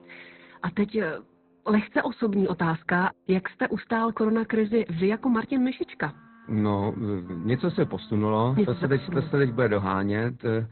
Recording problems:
high frequencies cut off; severe; nothing above 4 kHz
garbled, watery; slightly
background music; faint; throughout; 25 dB below the speech

